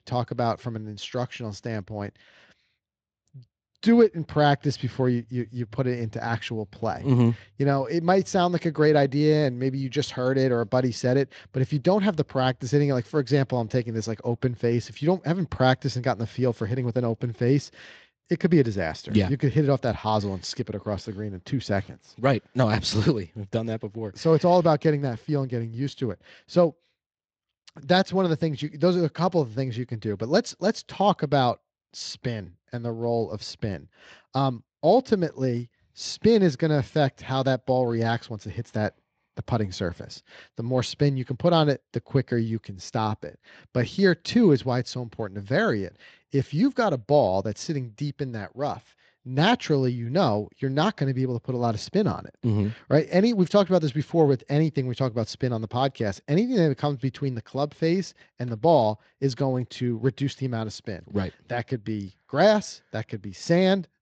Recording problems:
garbled, watery; slightly; nothing above 7.5 kHz

